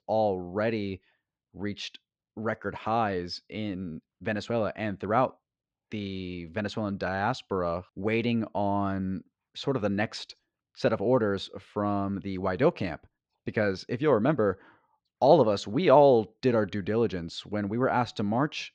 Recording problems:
muffled; very slightly; fading above 4 kHz

